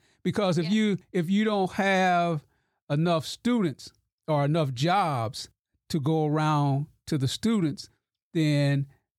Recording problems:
none

